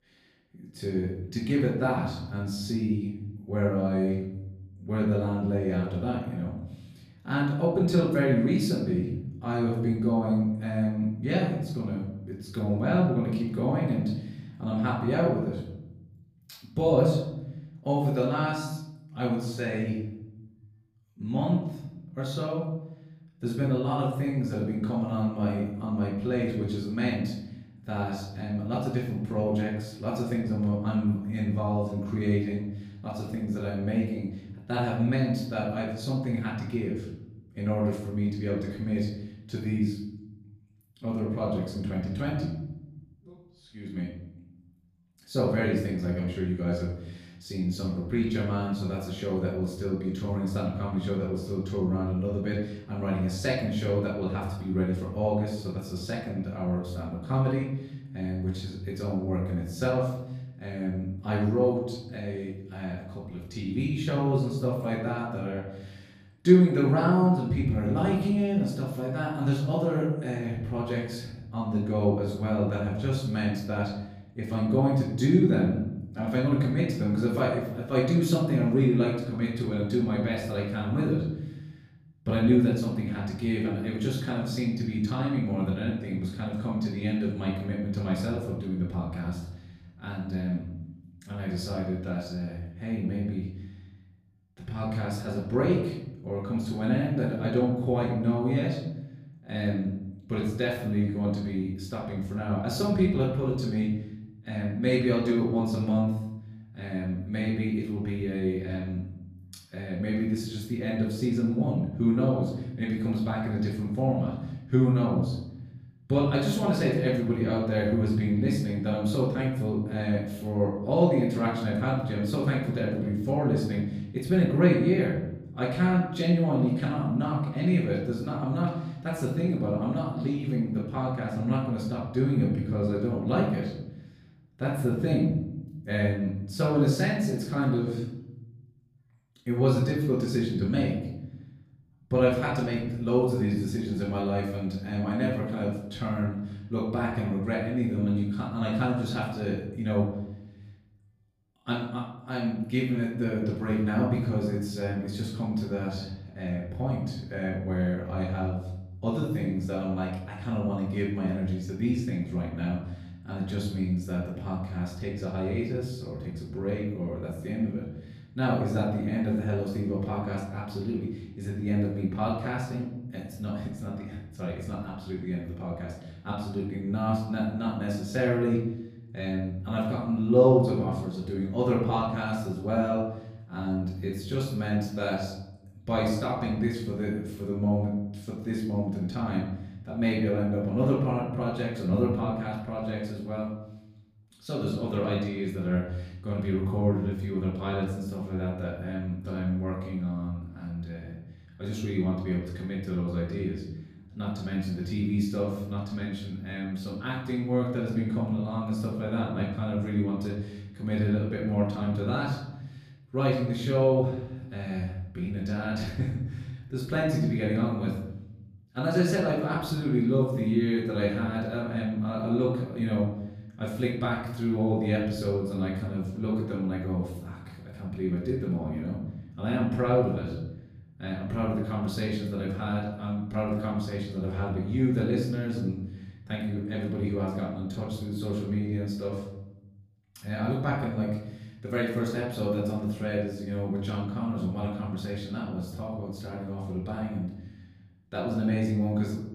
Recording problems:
off-mic speech; far
room echo; noticeable; dies away in 0.9 s

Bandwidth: 15 kHz